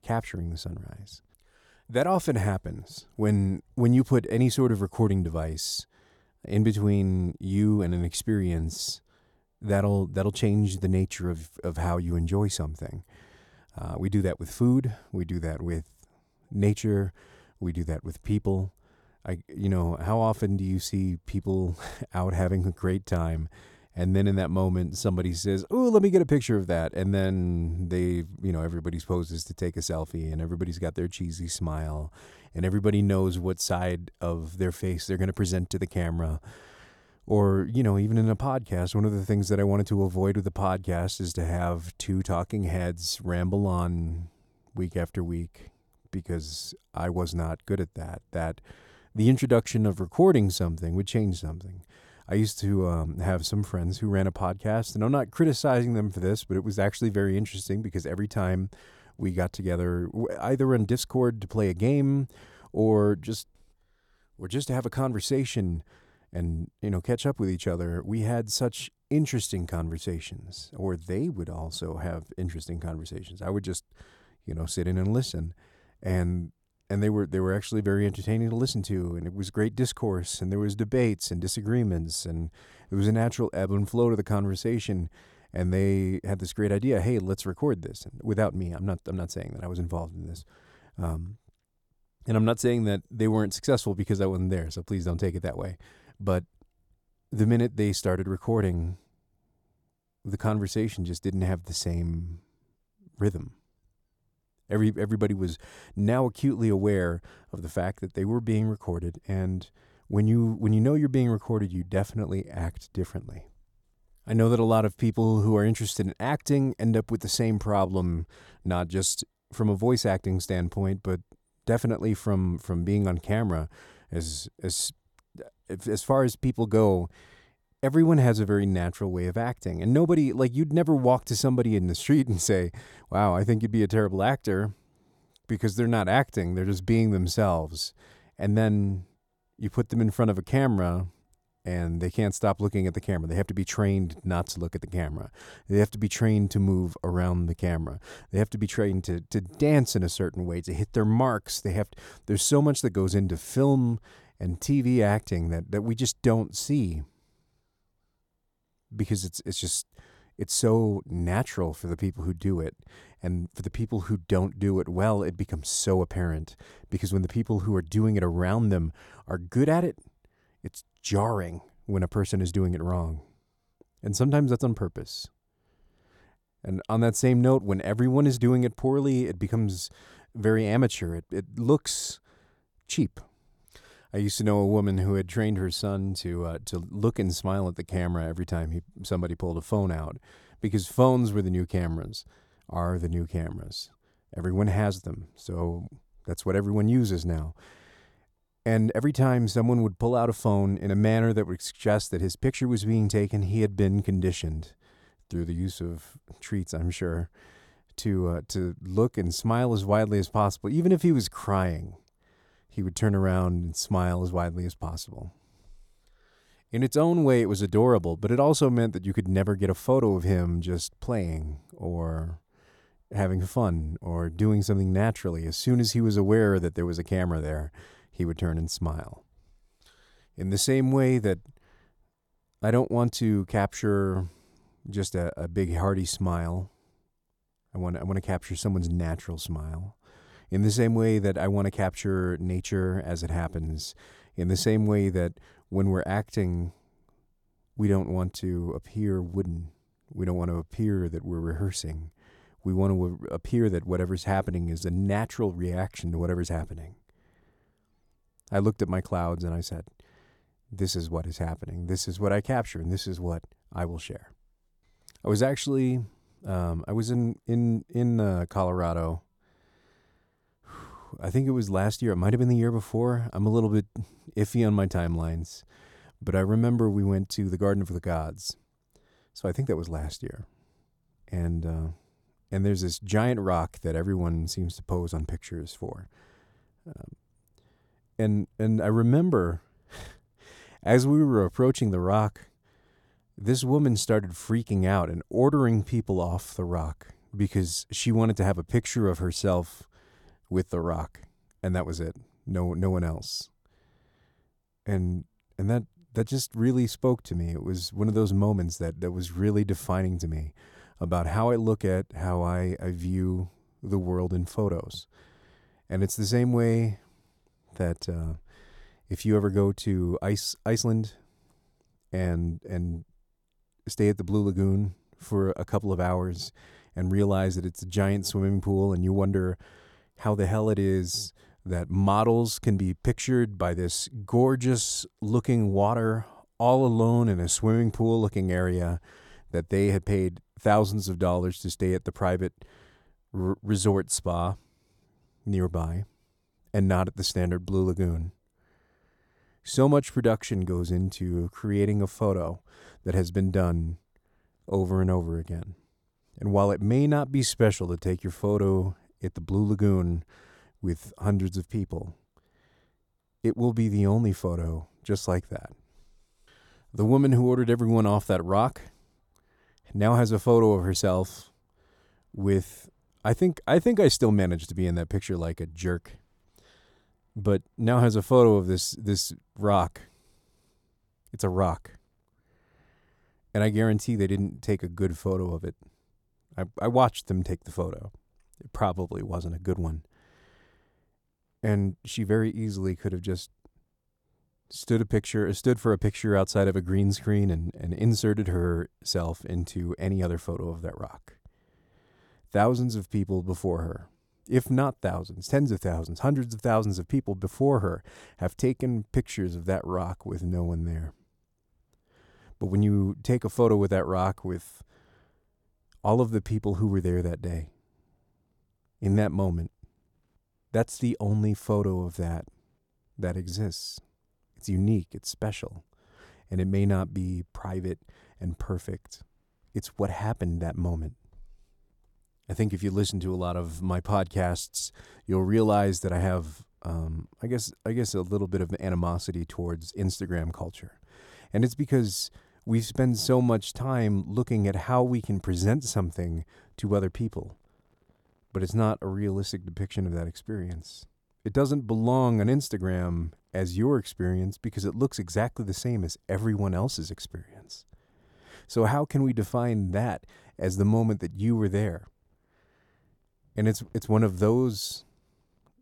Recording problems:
none

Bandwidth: 17.5 kHz